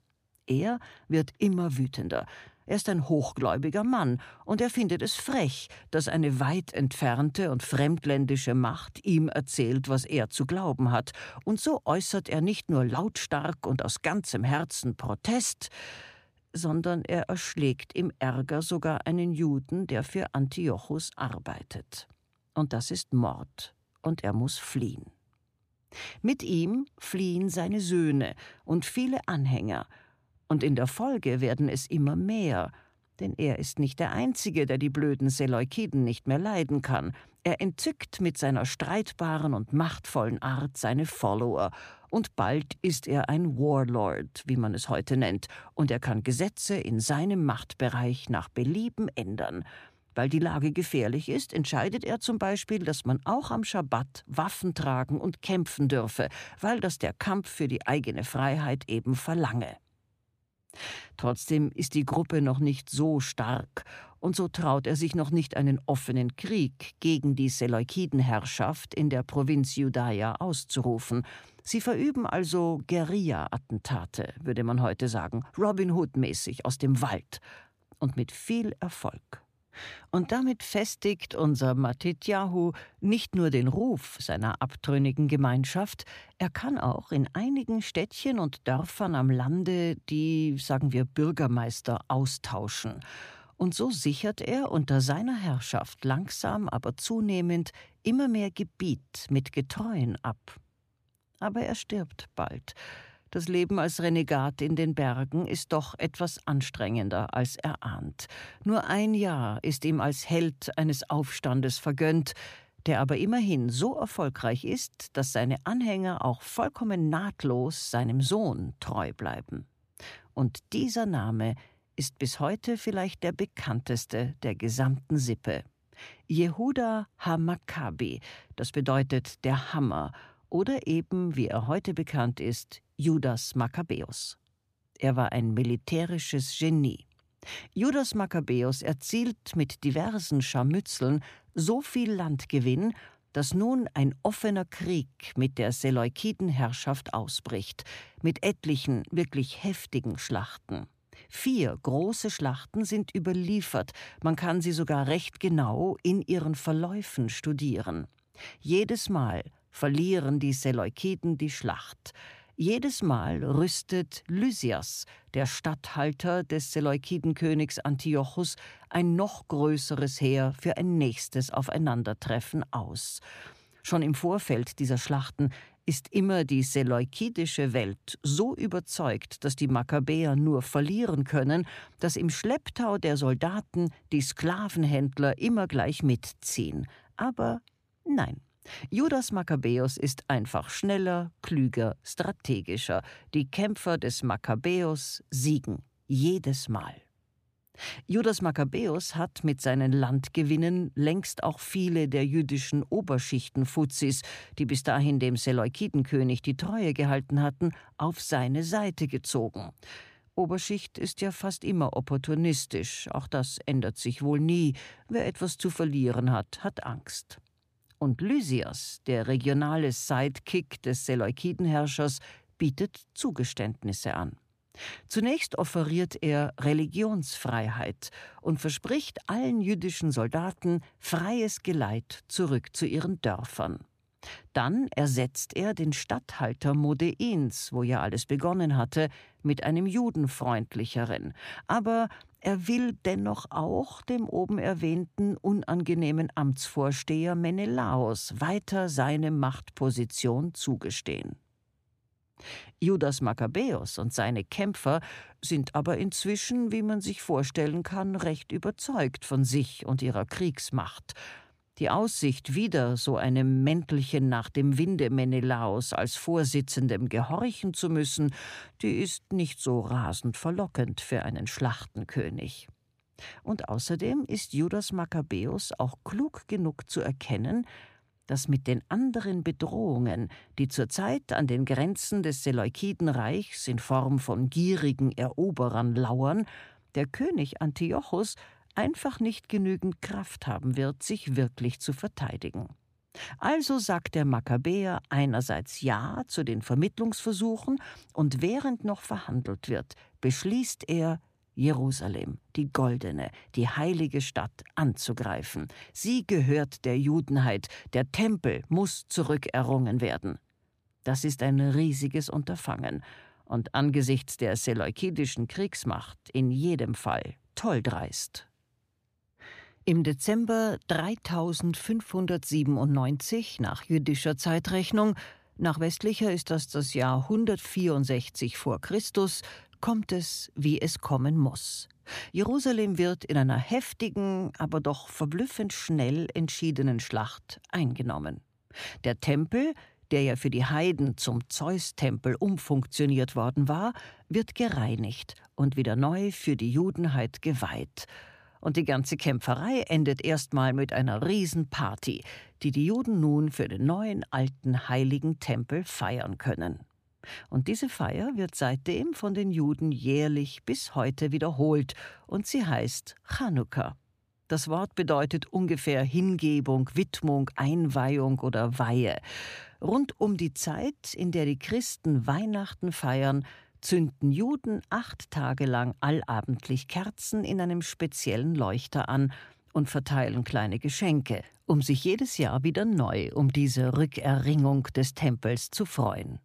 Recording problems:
uneven, jittery; strongly; from 42 s to 5:27

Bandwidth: 14.5 kHz